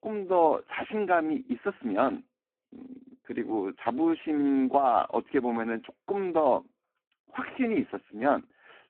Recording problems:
phone-call audio; poor line

